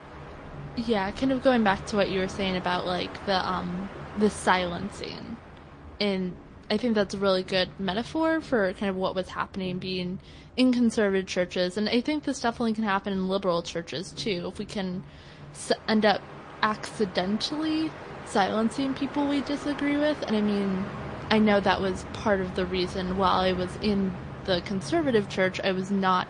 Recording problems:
garbled, watery; slightly; nothing above 8.5 kHz
train or aircraft noise; noticeable; throughout; 15 dB below the speech

